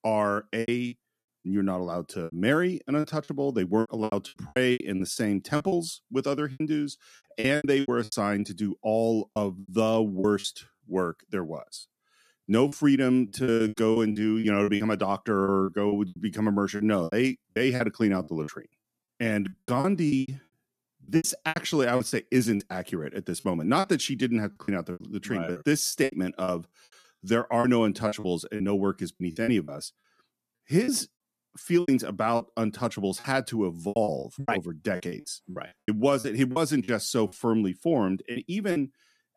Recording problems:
choppy; very; 14% of the speech affected

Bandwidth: 14.5 kHz